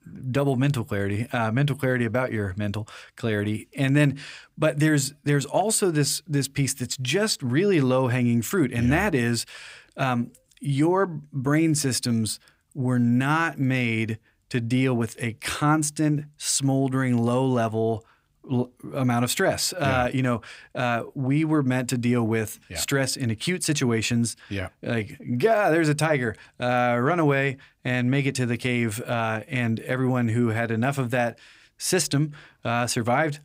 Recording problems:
none

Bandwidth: 15.5 kHz